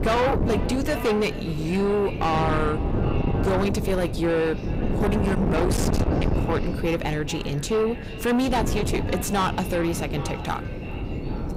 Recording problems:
distortion; heavy; 6 dB below the speech
echo of what is said; noticeable; throughout; 390 ms later, 15 dB below the speech
wind noise on the microphone; heavy; 7 dB below the speech

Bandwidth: 15.5 kHz